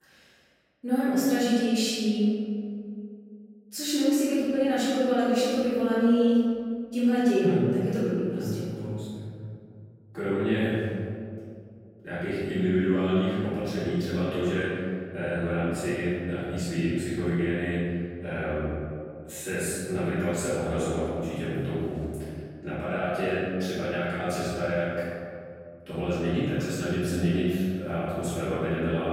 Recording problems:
room echo; strong; dies away in 2.3 s
off-mic speech; far

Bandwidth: 16 kHz